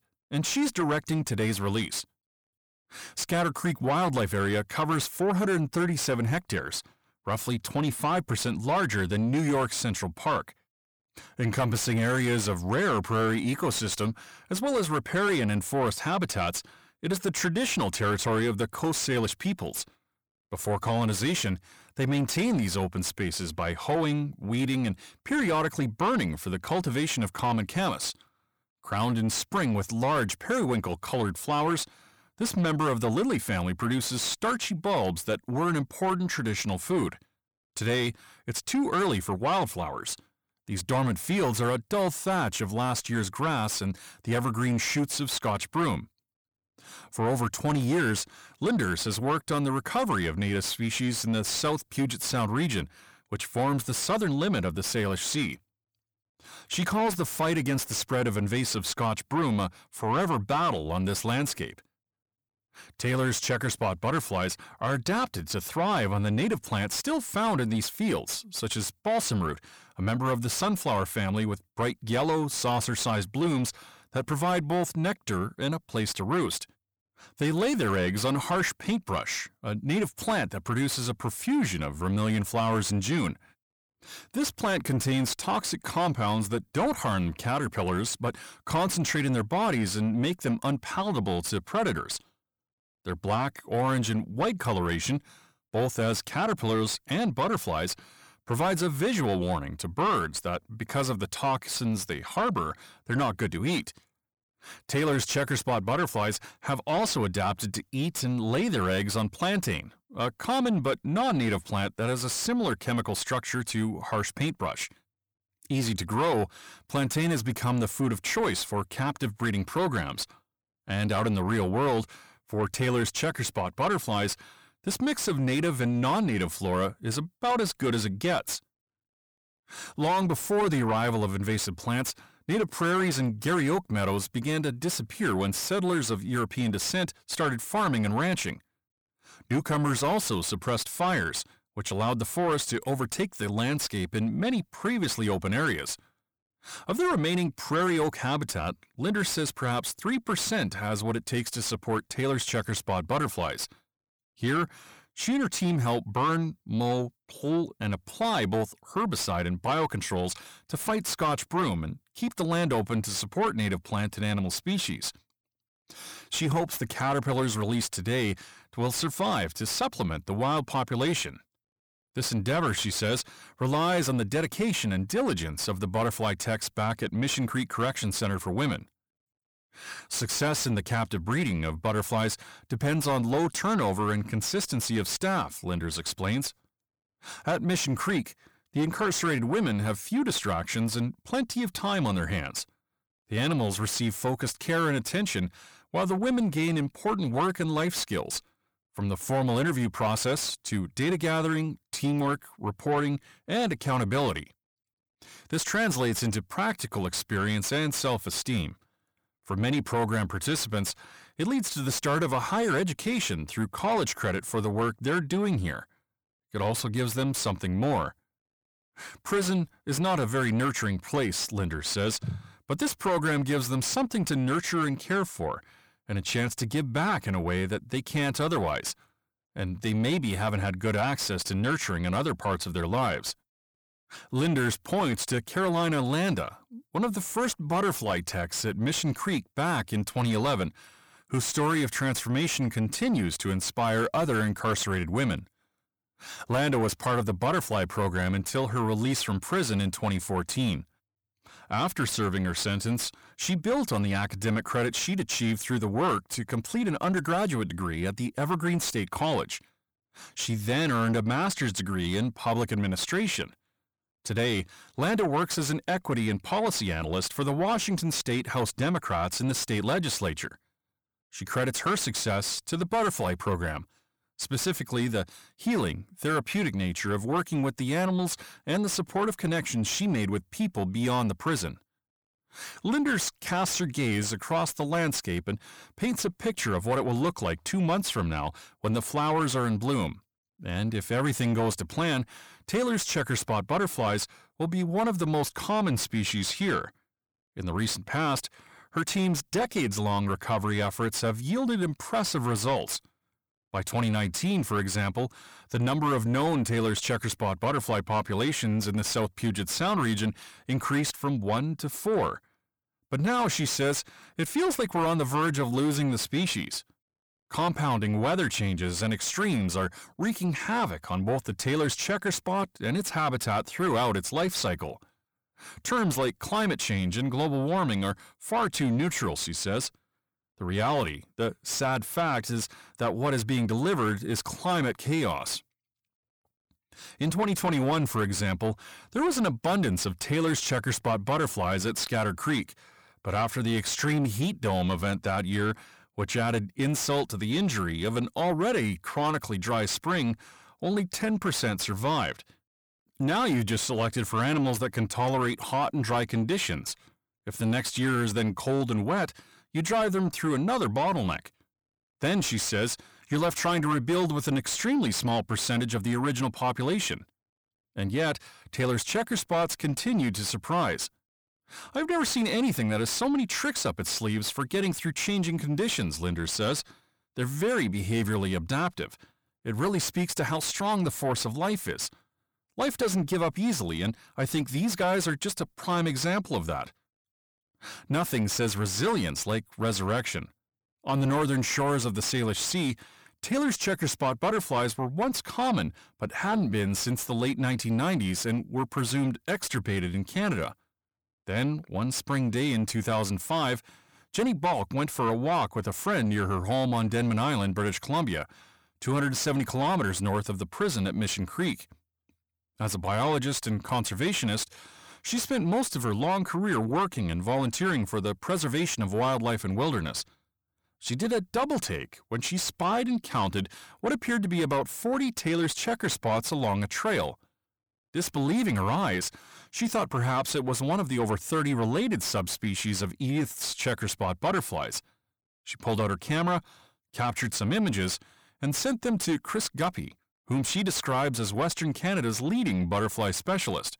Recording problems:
distortion; slight; 10 dB below the speech

